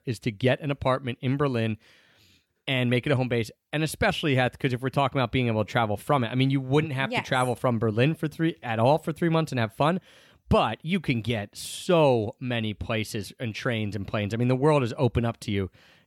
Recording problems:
none

